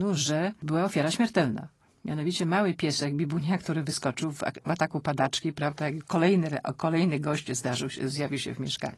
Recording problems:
garbled, watery; slightly; nothing above 11 kHz
abrupt cut into speech; at the start

